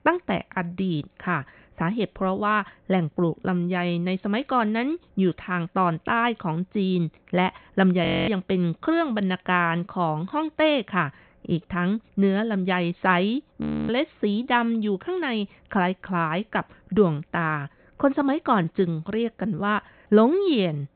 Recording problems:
high frequencies cut off; severe; nothing above 4 kHz
audio freezing; at 8 s and at 14 s

